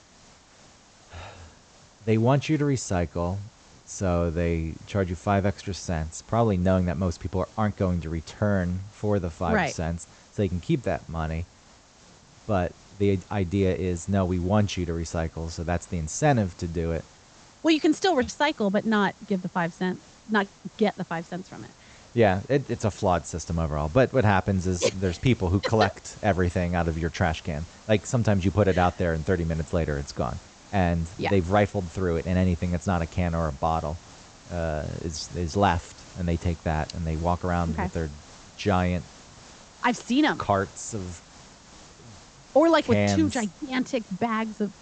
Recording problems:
high frequencies cut off; noticeable; nothing above 8 kHz
hiss; faint; throughout; 25 dB below the speech

